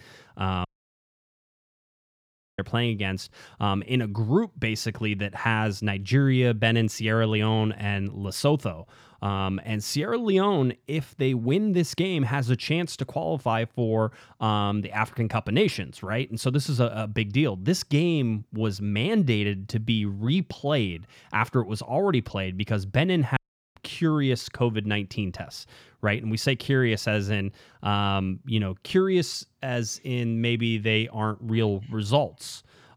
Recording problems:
audio cutting out; at 0.5 s for 2 s and at 23 s

